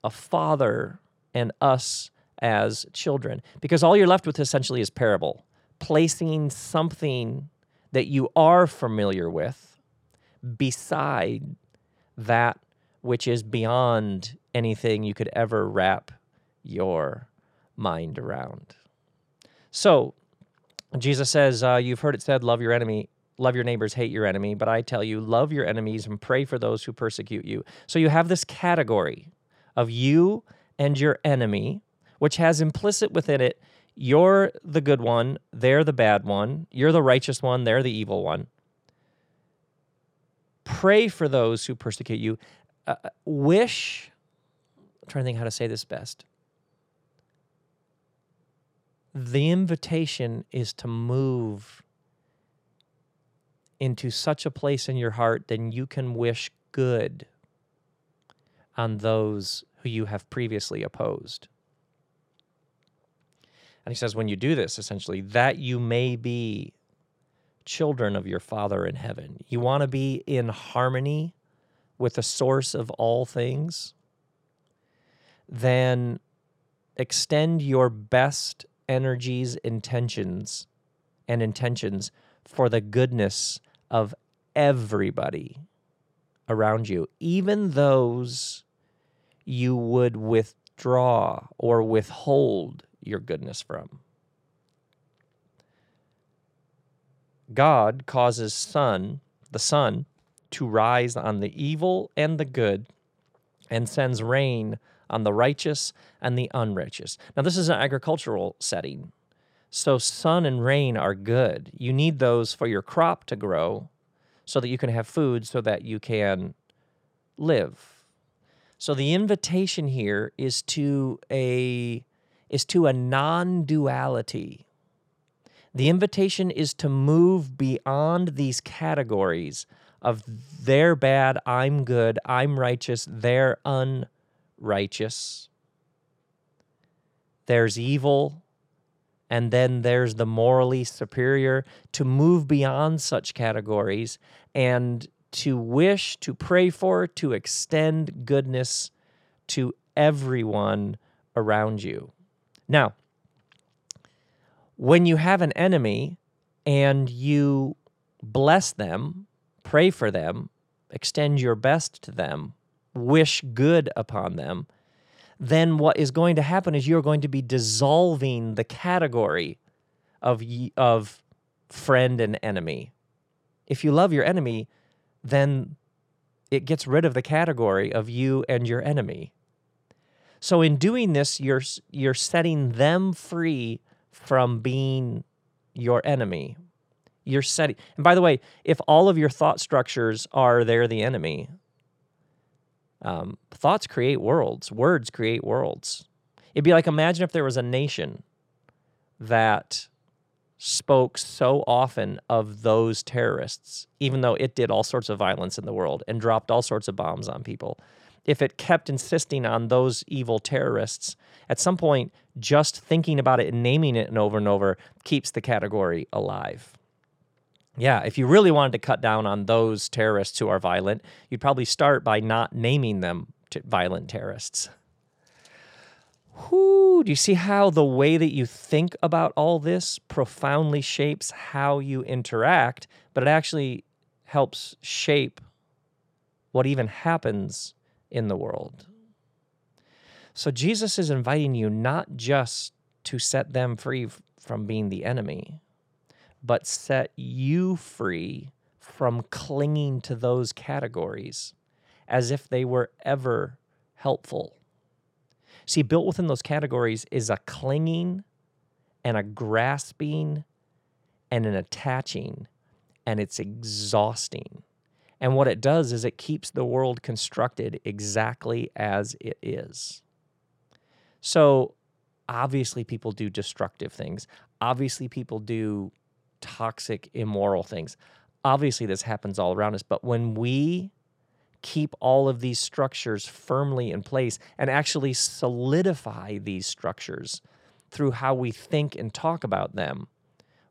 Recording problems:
none

